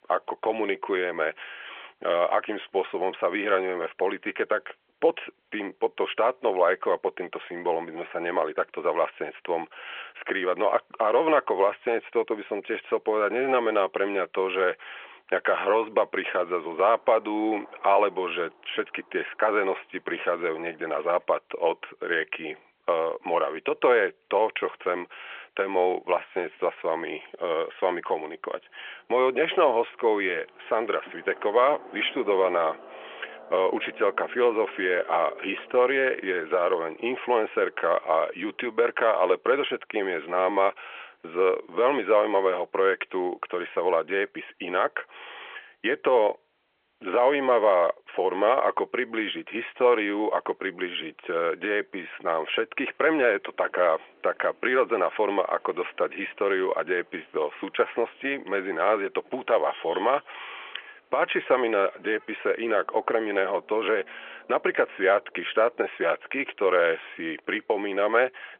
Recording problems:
phone-call audio; nothing above 3.5 kHz
traffic noise; faint; throughout; 25 dB below the speech

